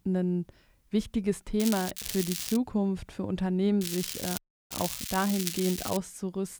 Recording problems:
crackling; loud; at 1.5 s, at 2 s and from 4 to 6 s; 4 dB below the speech
audio cutting out; at 4.5 s

